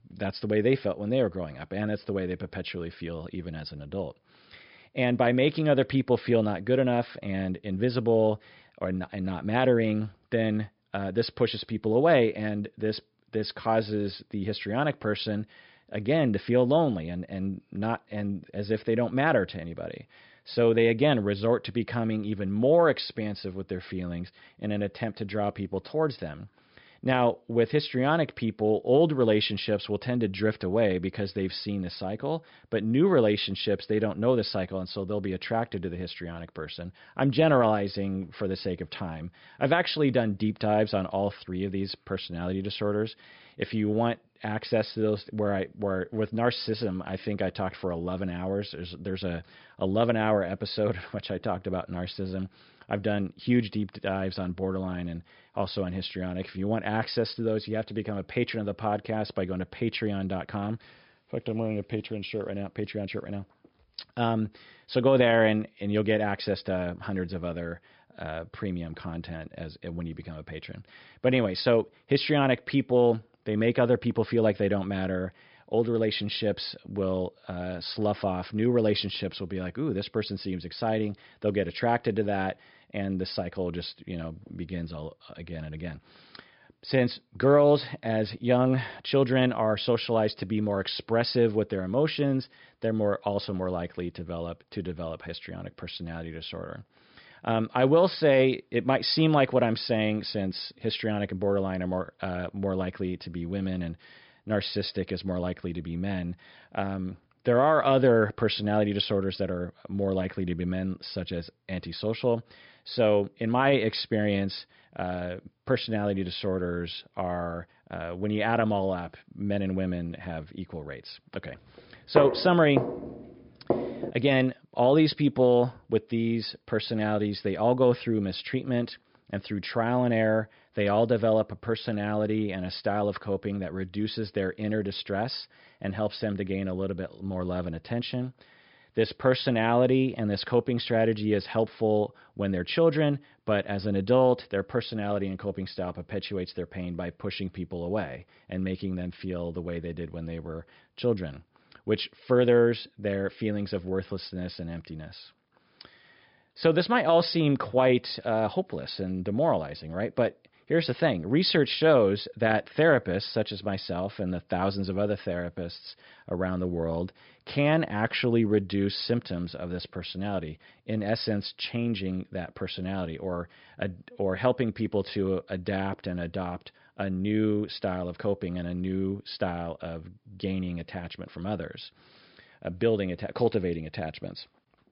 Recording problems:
high frequencies cut off; noticeable; nothing above 5.5 kHz
footsteps; loud; from 2:02 to 2:04; peak level with the speech

